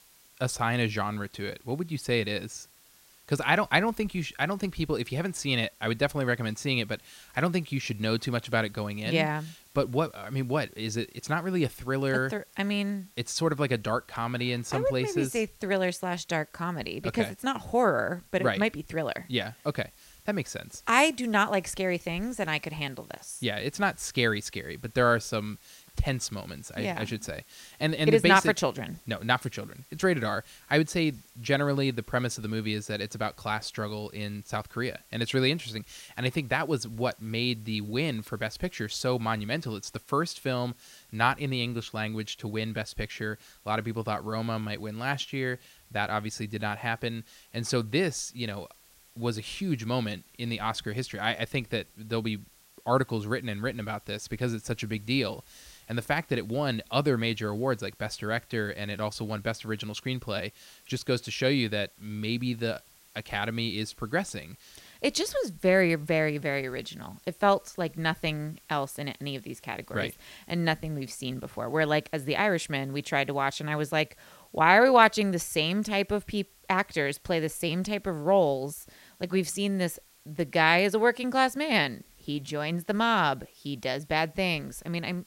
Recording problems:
hiss; faint; throughout; 25 dB below the speech

